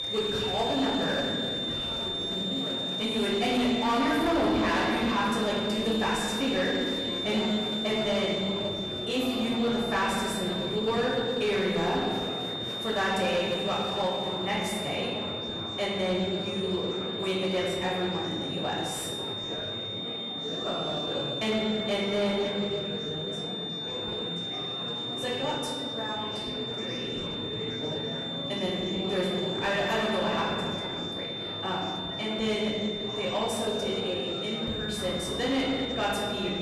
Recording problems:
off-mic speech; far
room echo; noticeable; dies away in 1.8 s
distortion; slight; 10 dB below the speech
high-pitched whine; loud; throughout; 3.5 kHz, 3 dB below the speech
murmuring crowd; loud; throughout; 9 dB below the speech
background music; noticeable; from 17 s on; 15 dB below the speech

